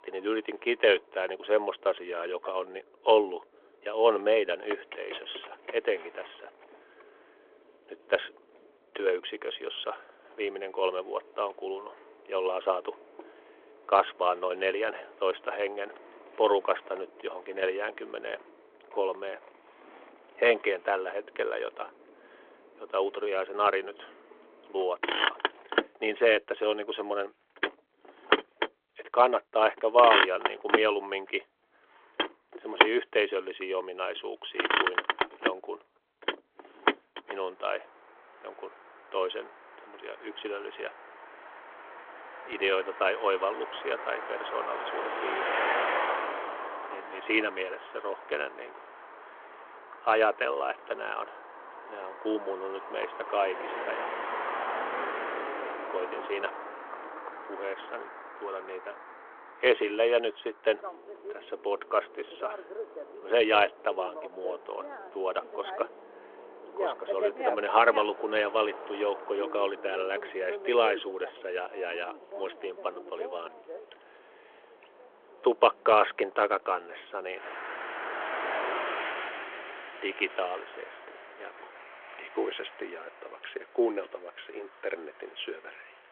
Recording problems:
phone-call audio
traffic noise; loud; throughout; 4 dB below the speech

